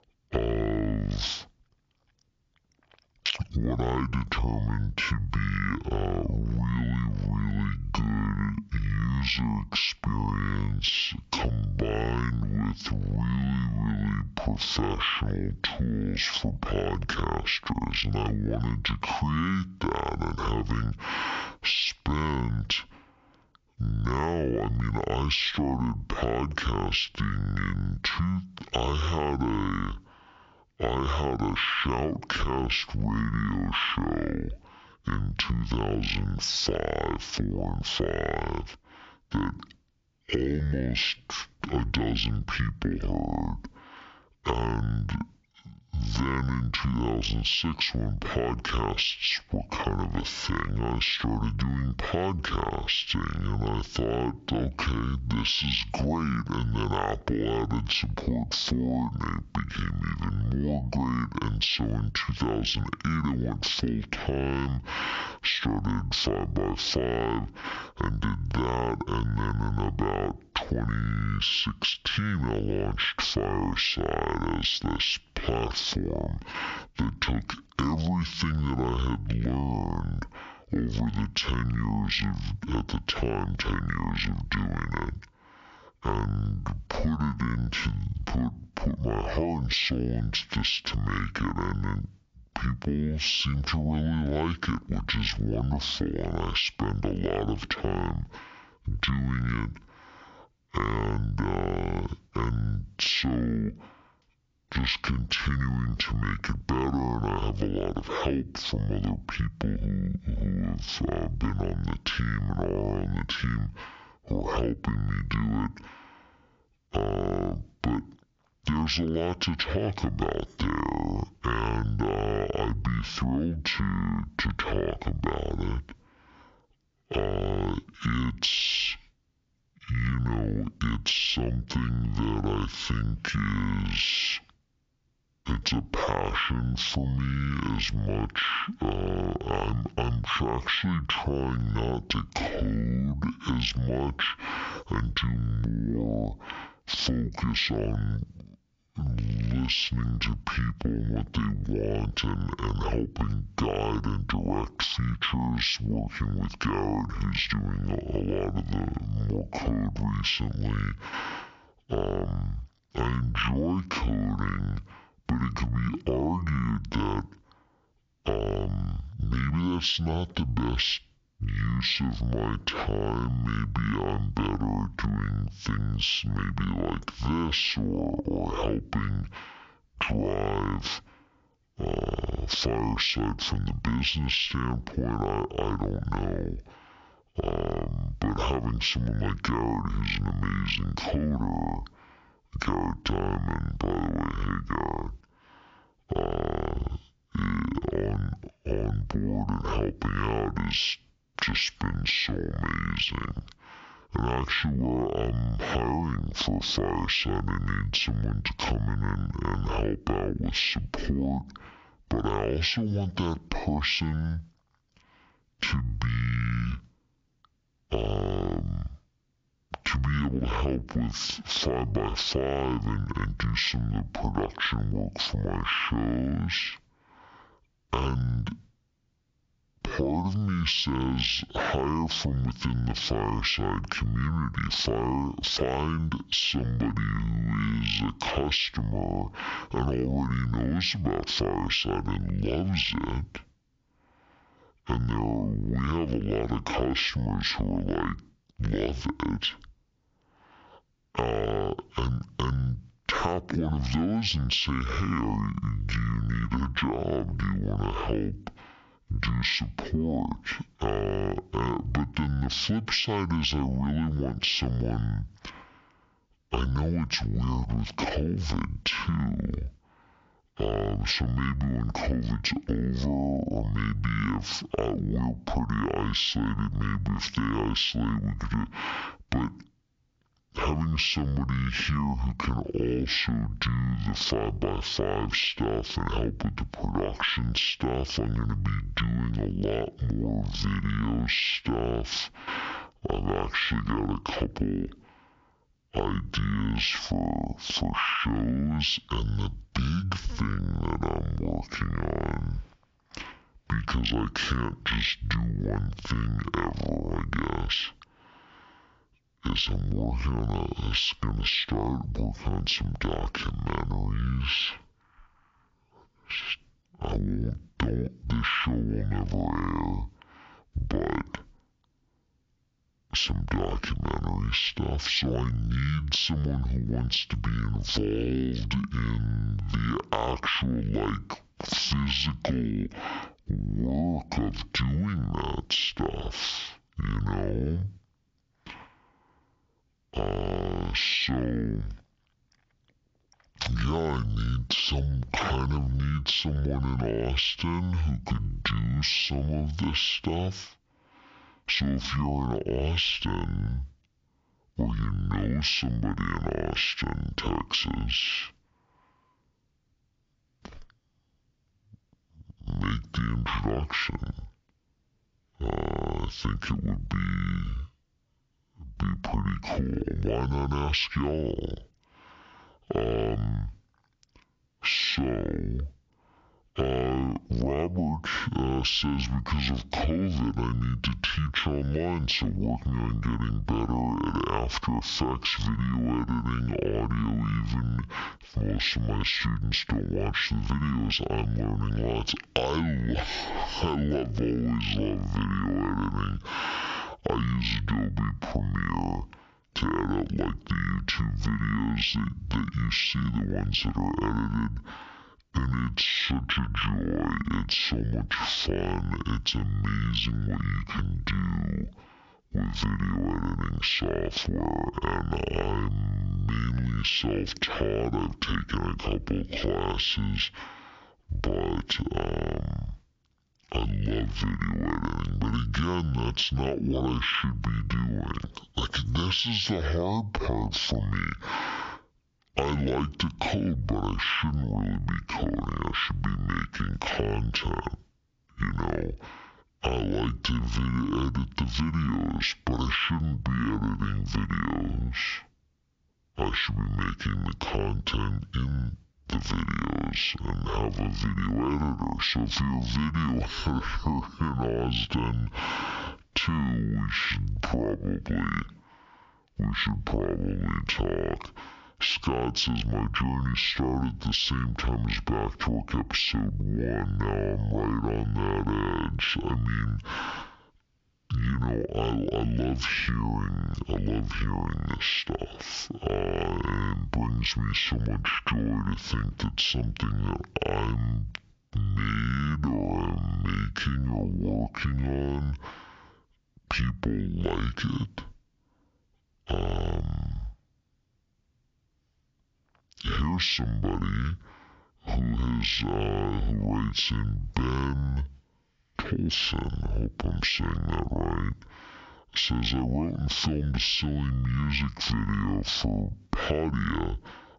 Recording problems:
squashed, flat; heavily
wrong speed and pitch; too slow and too low; 0.5 times normal speed

